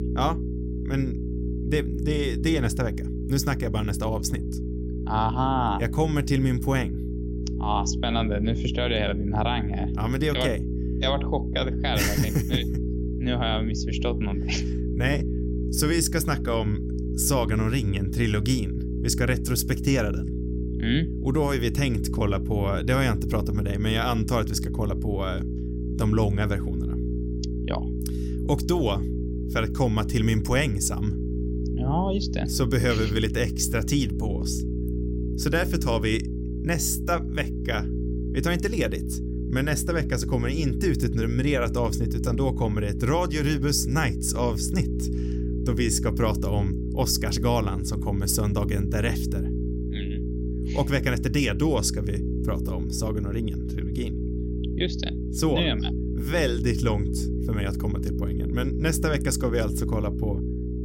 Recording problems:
electrical hum; loud; throughout; 60 Hz, 9 dB below the speech

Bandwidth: 16.5 kHz